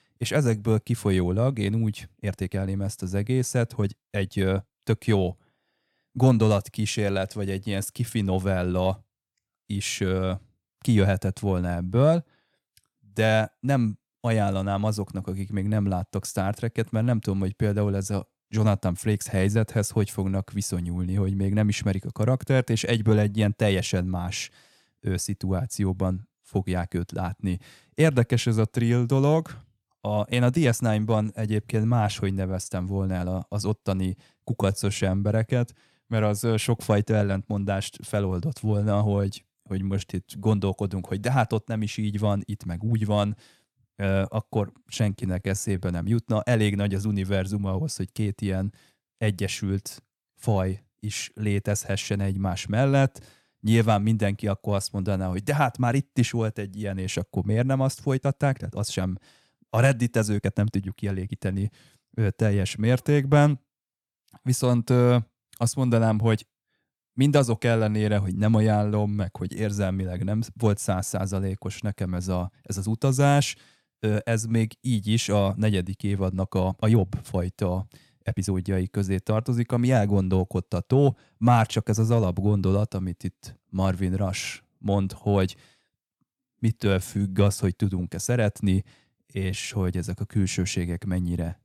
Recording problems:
uneven, jittery; strongly; from 2 s to 1:30

